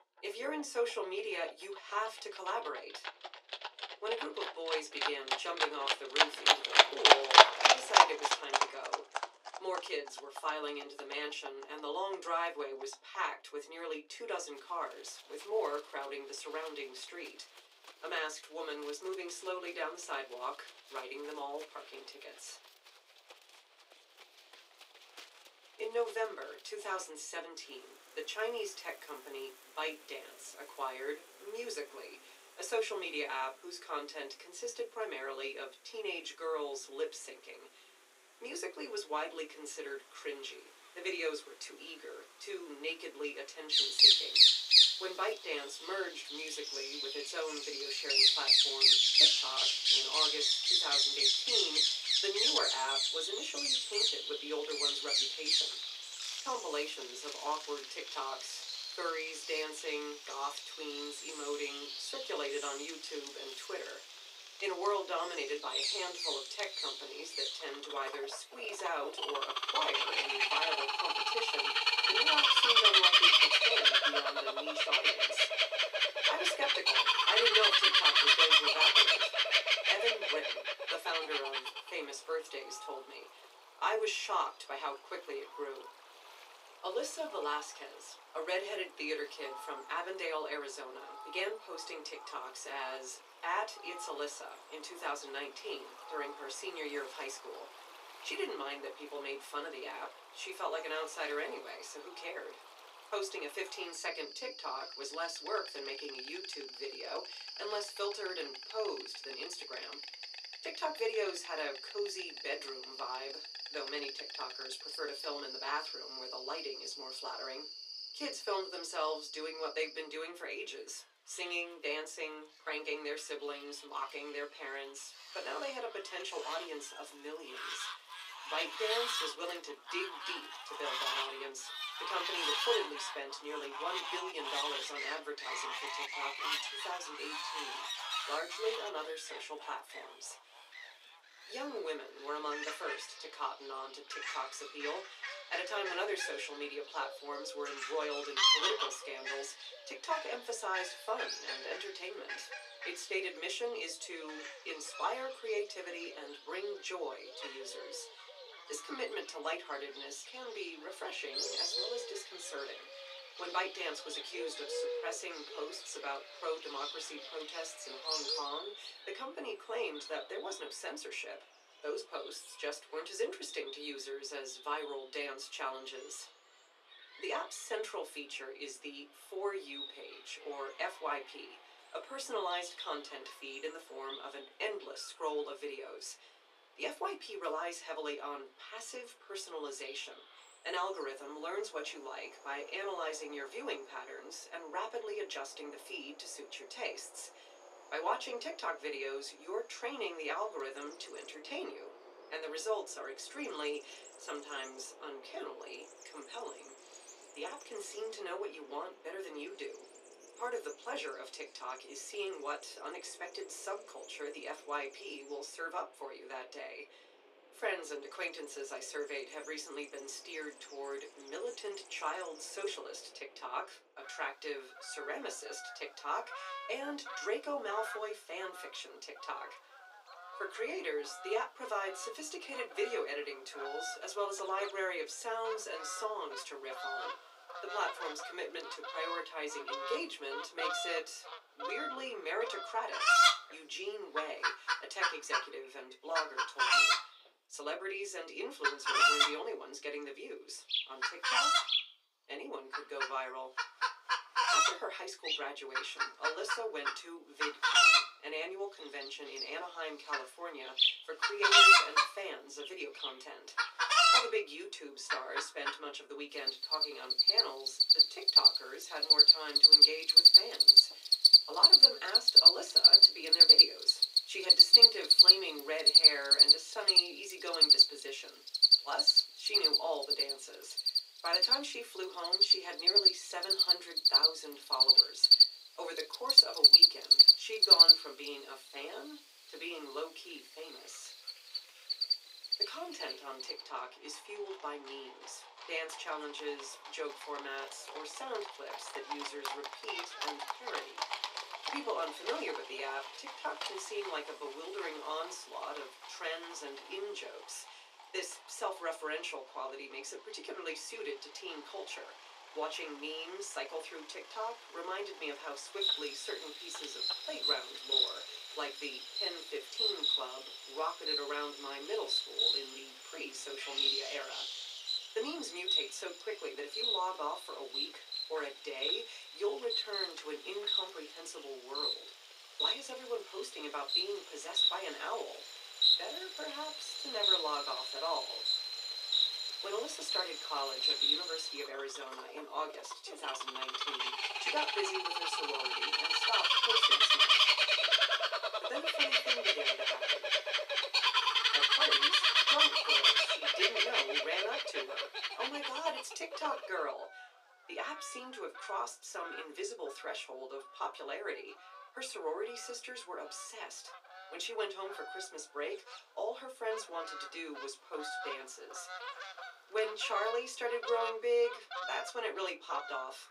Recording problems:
off-mic speech; far
thin; very; fading below 400 Hz
room echo; very slight; dies away in 0.2 s
animal sounds; very loud; throughout; 15 dB above the speech

